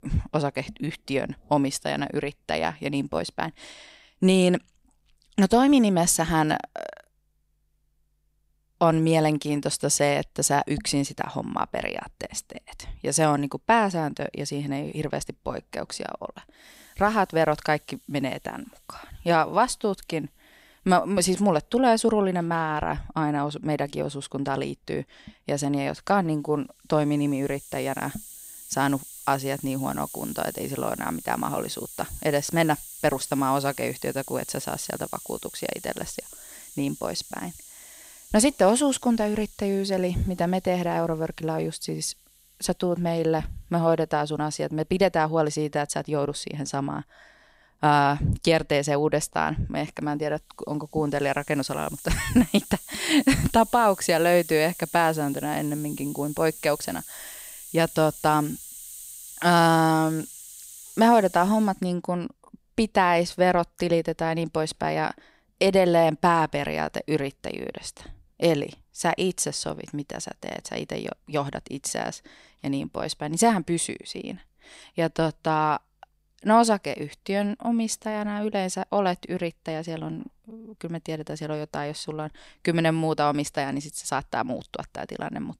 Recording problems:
hiss; noticeable; from 17 s to 1:02; 15 dB below the speech

